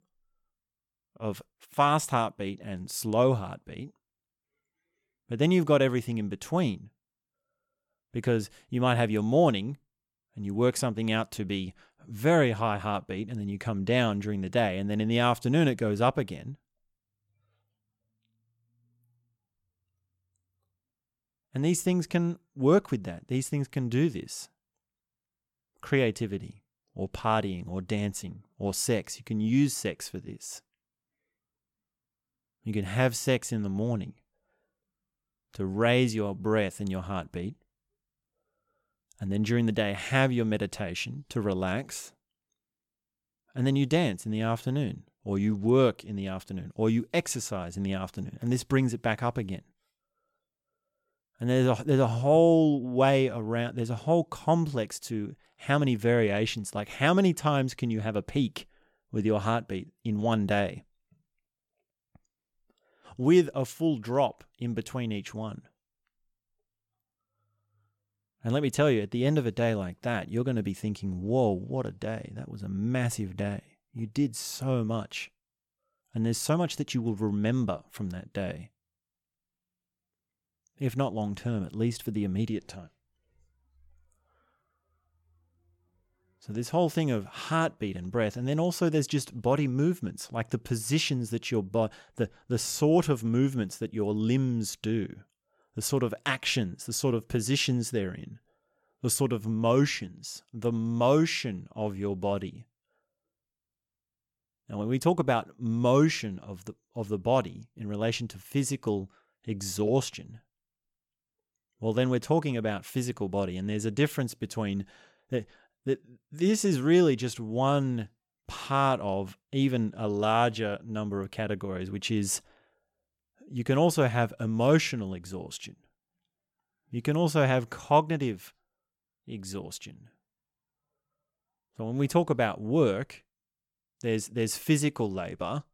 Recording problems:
none

